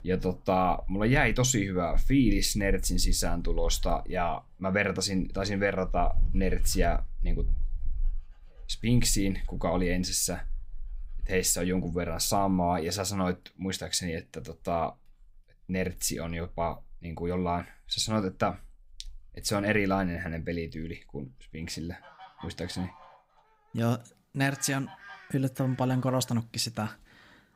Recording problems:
animal sounds; noticeable; throughout; 10 dB below the speech

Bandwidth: 15.5 kHz